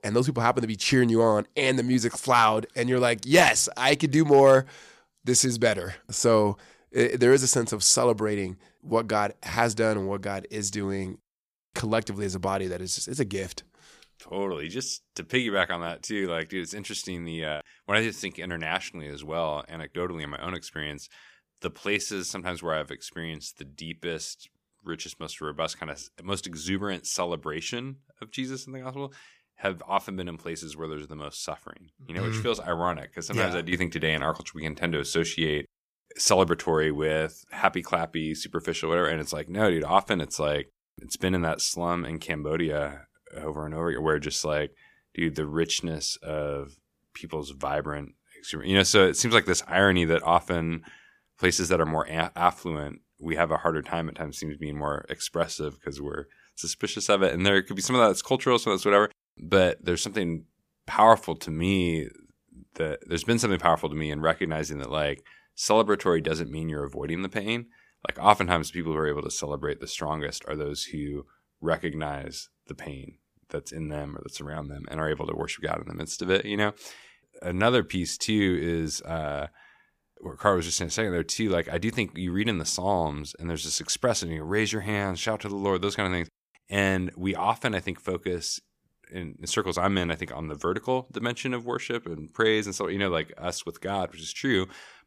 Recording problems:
none

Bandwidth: 15 kHz